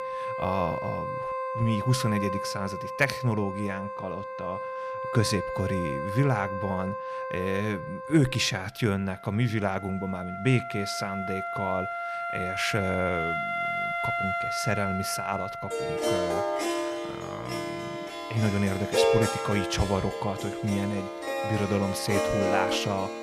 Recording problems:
background music; loud; throughout; 2 dB below the speech

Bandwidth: 14.5 kHz